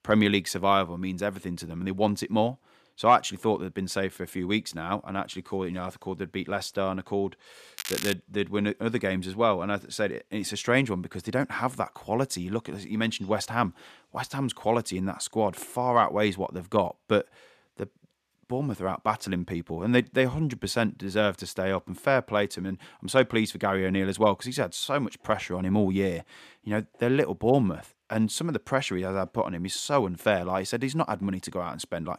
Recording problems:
crackling; loud; at 8 s; 6 dB below the speech

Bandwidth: 14.5 kHz